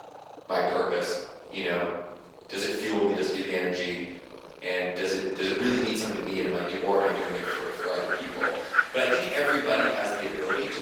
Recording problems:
room echo; strong; dies away in 1.1 s
off-mic speech; far
garbled, watery; slightly; nothing above 18.5 kHz
thin; very slightly; fading below 400 Hz
animal sounds; loud; throughout; 4 dB below the speech

